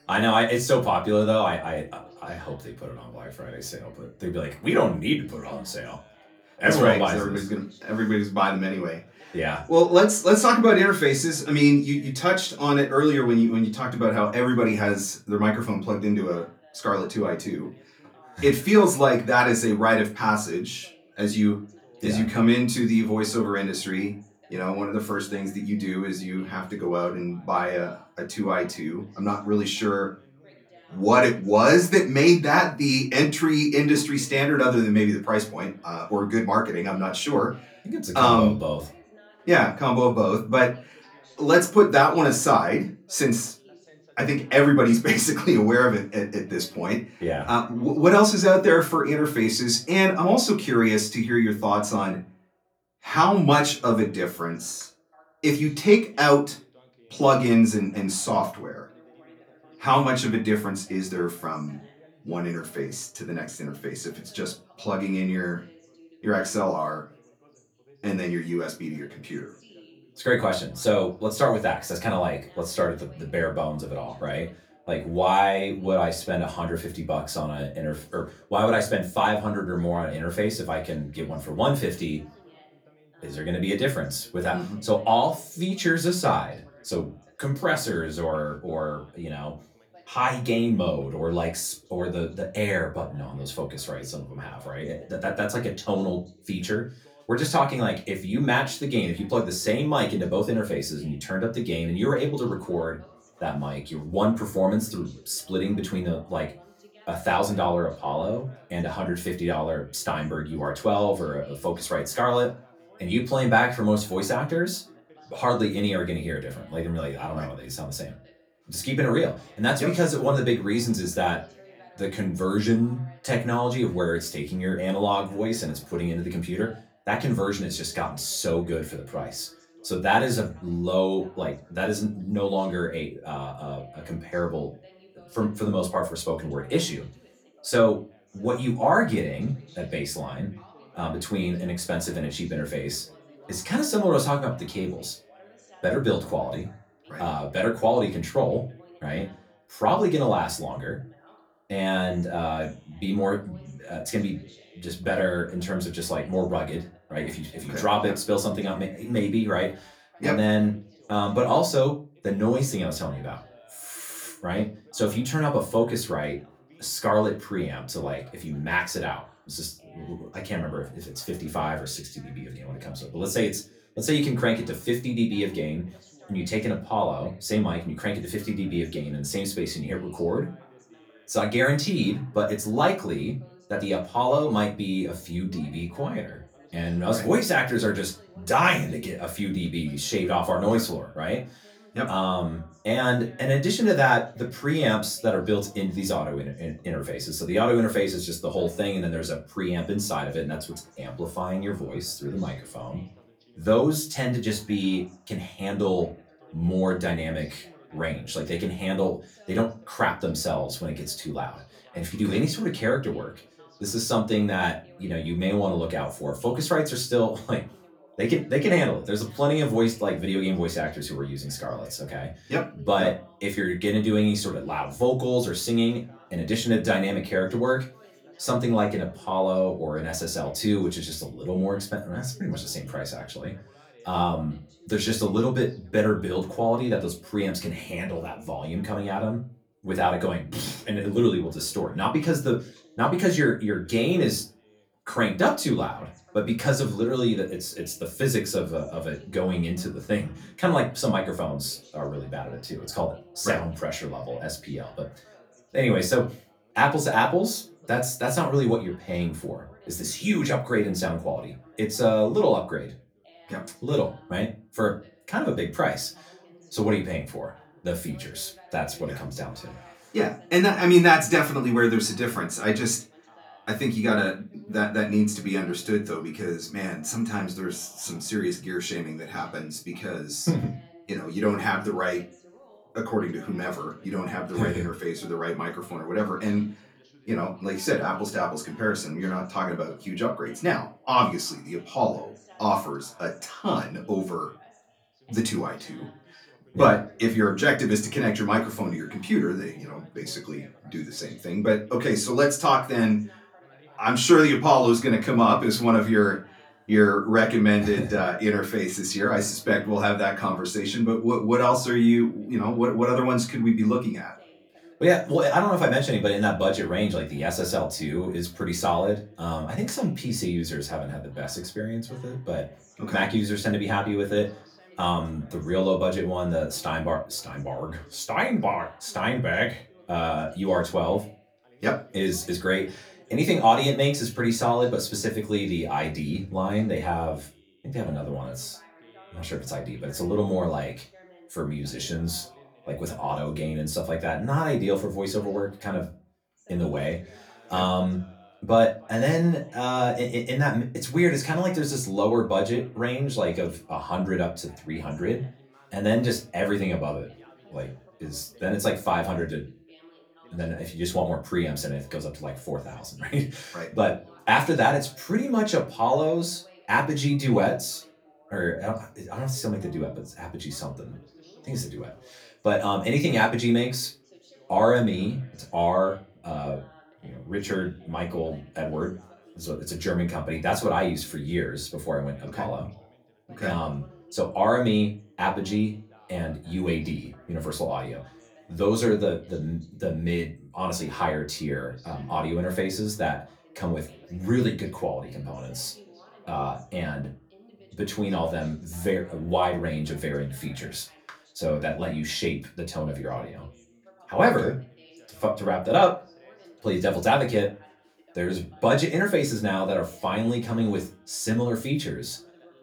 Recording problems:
off-mic speech; far
room echo; very slight; dies away in 0.2 s
background chatter; faint; throughout; 2 voices, 30 dB below the speech

